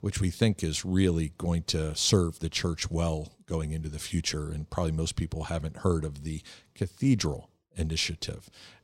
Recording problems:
none

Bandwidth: 16 kHz